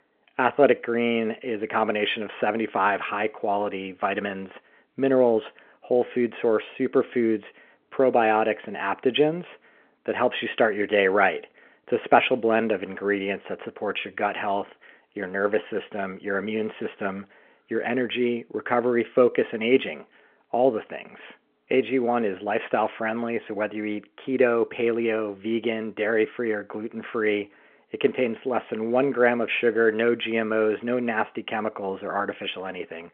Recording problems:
phone-call audio; nothing above 3.5 kHz

